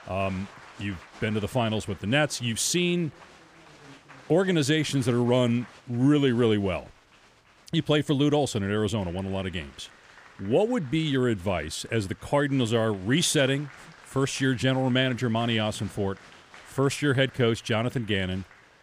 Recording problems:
crowd noise; faint; throughout; 25 dB below the speech

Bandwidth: 15 kHz